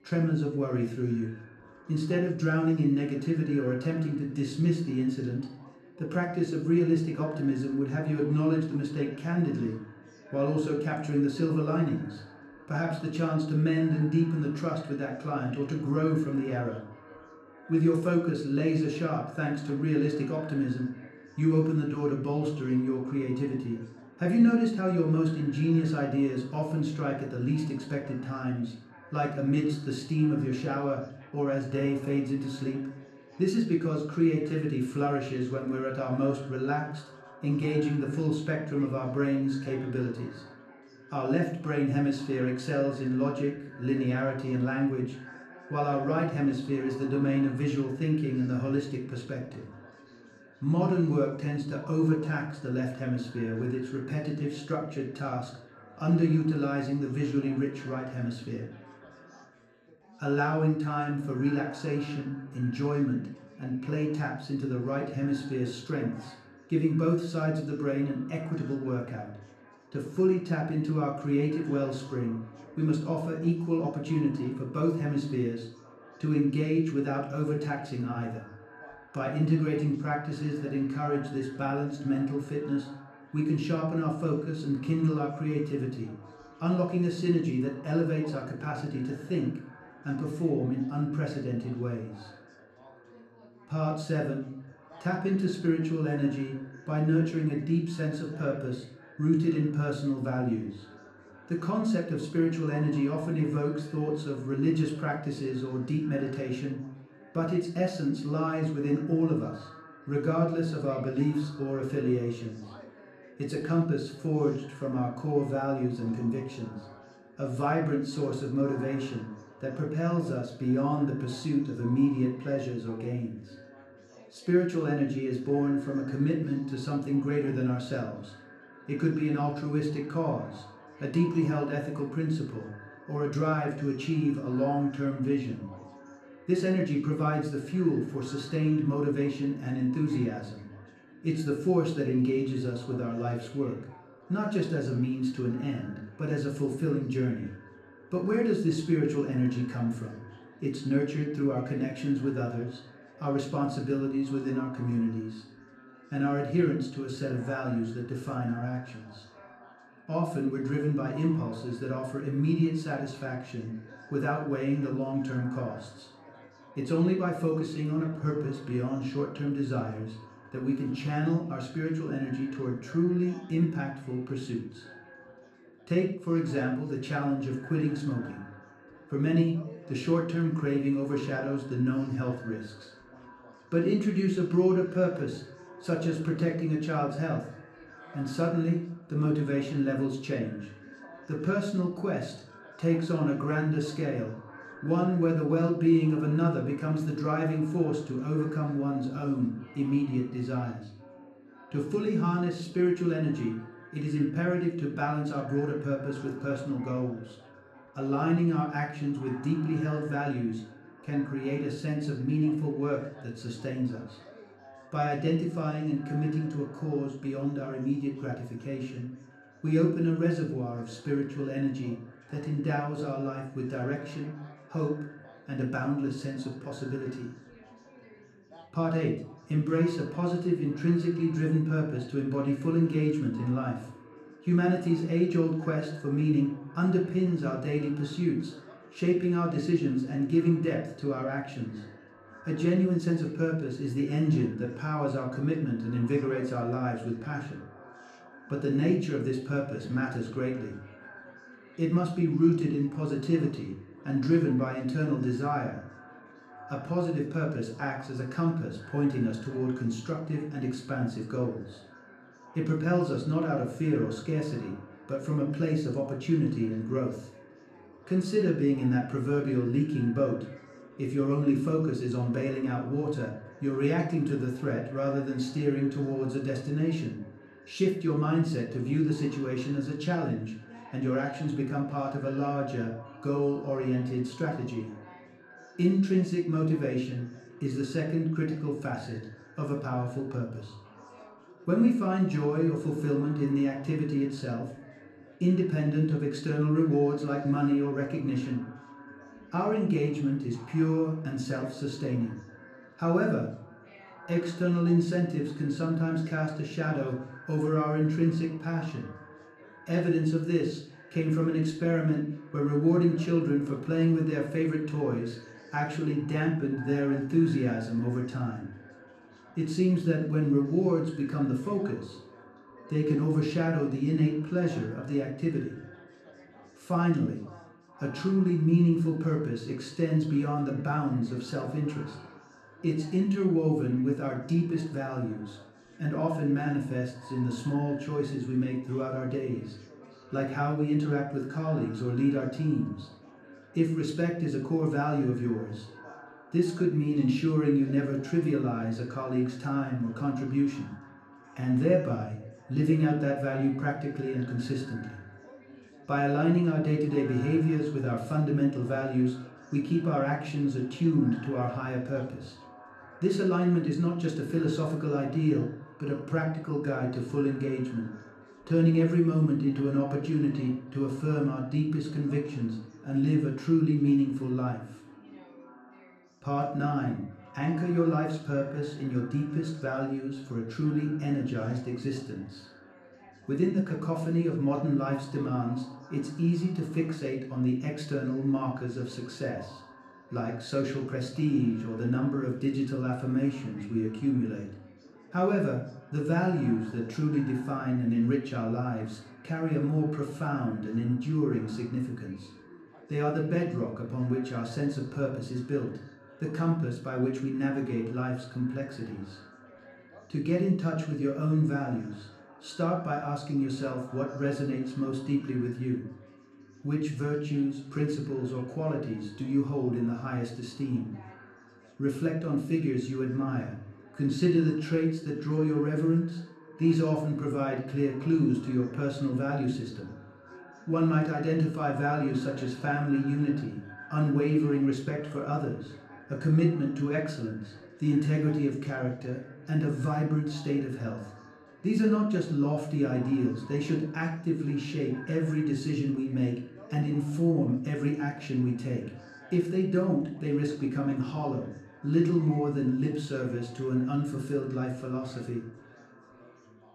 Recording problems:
off-mic speech; far
echo of what is said; faint; throughout; 490 ms later, 25 dB below the speech
room echo; slight; dies away in 0.5 s
background chatter; faint; throughout; 3 voices, 30 dB below the speech

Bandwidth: 13.5 kHz